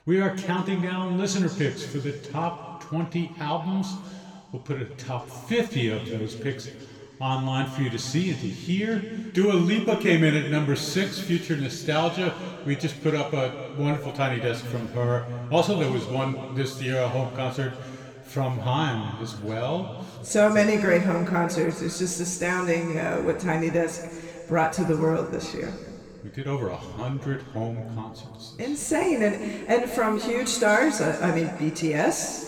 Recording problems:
room echo; noticeable; dies away in 2.2 s
off-mic speech; somewhat distant

